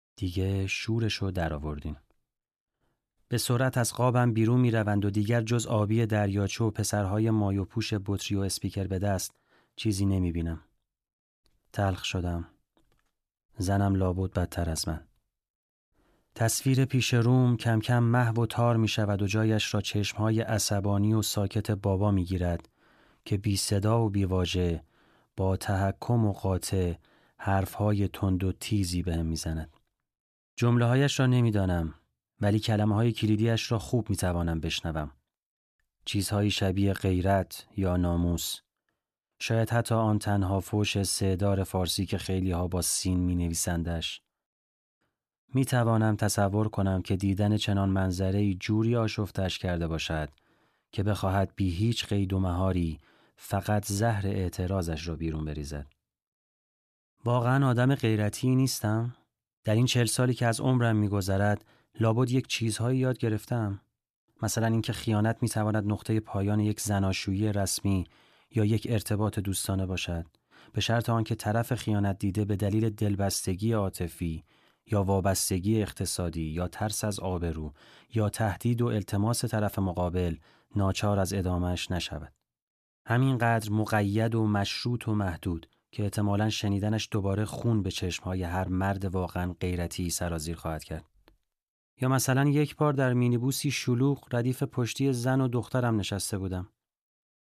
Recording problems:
none

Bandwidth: 14 kHz